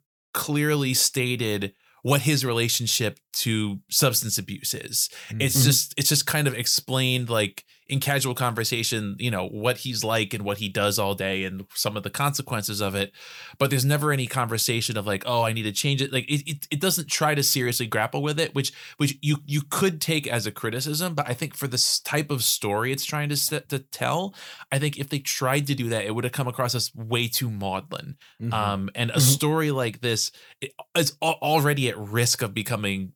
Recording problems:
none

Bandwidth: 19 kHz